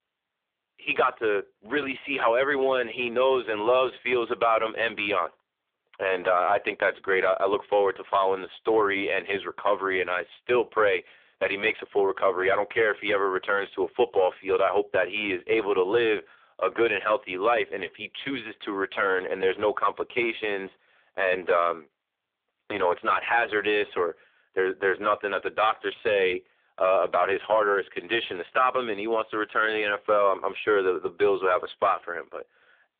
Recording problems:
phone-call audio; poor line; nothing above 3.5 kHz

